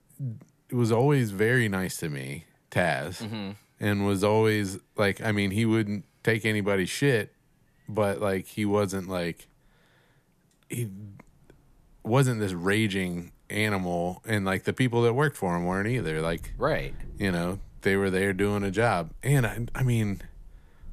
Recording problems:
wind in the background; faint; throughout; 20 dB below the speech

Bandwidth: 14.5 kHz